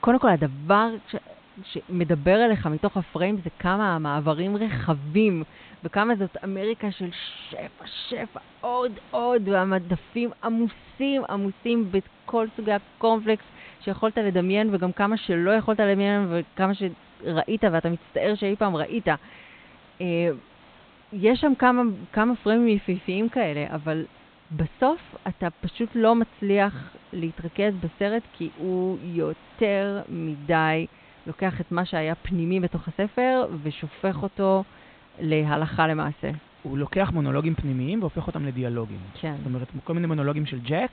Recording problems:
high frequencies cut off; severe; nothing above 4 kHz
hiss; faint; throughout; 25 dB below the speech

